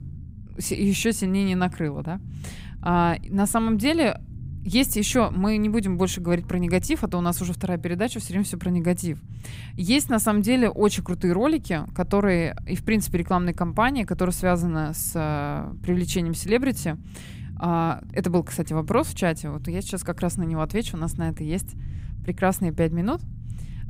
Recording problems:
low rumble; faint; throughout; 25 dB below the speech

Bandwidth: 15.5 kHz